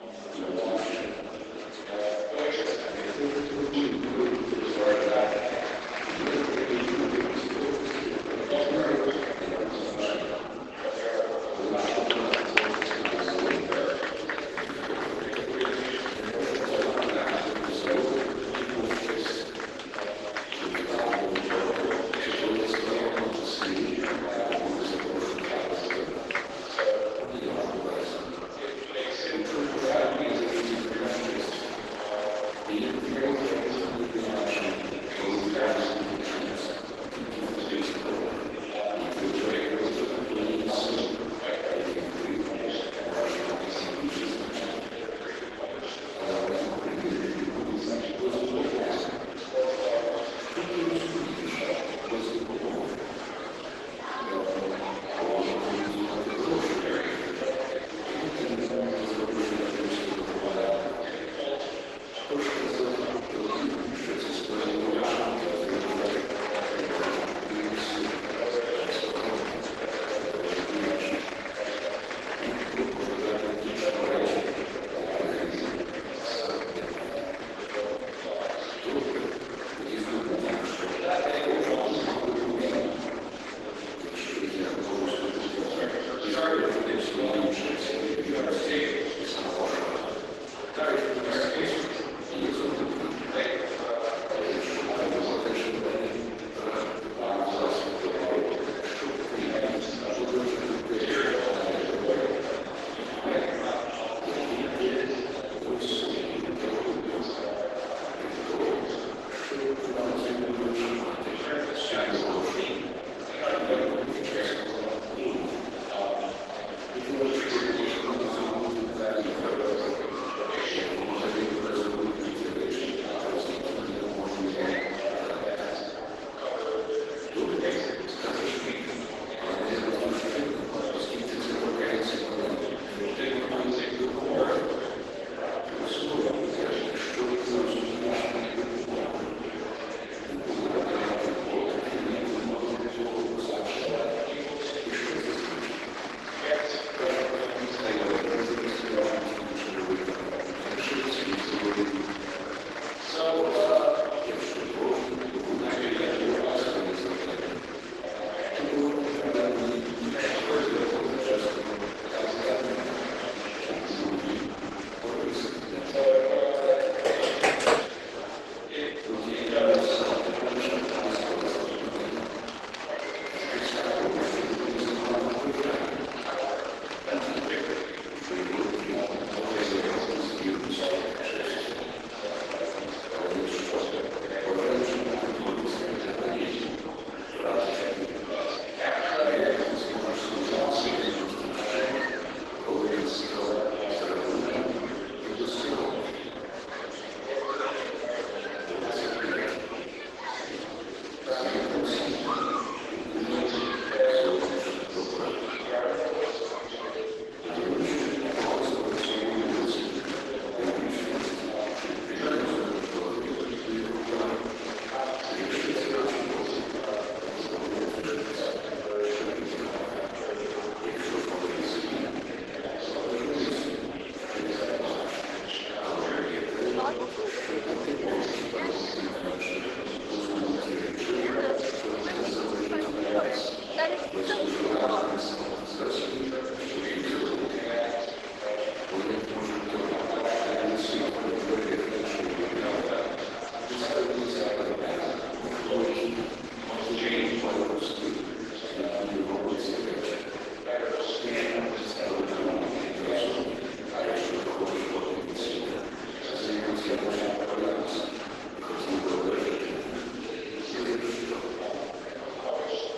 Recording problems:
room echo; strong; dies away in 1.8 s
off-mic speech; far
garbled, watery; badly; nothing above 12 kHz
thin; somewhat; fading below 300 Hz
murmuring crowd; very loud; throughout; as loud as the speech
keyboard typing; loud; from 2:47 to 2:48; peak 10 dB above the speech

